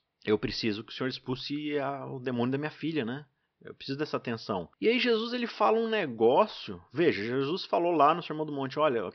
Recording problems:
high frequencies cut off; noticeable; nothing above 5.5 kHz

